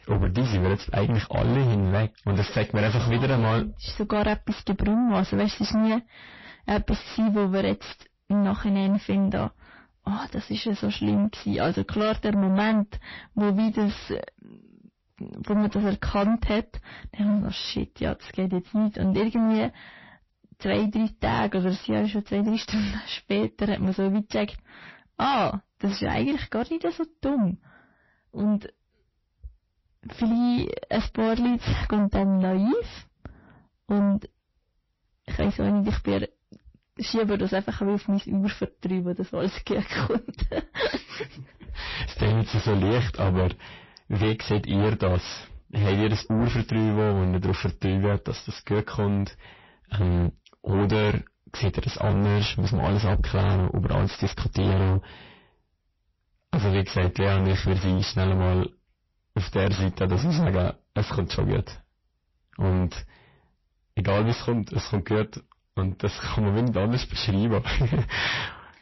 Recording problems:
distortion; heavy; 6 dB below the speech
garbled, watery; slightly; nothing above 5.5 kHz

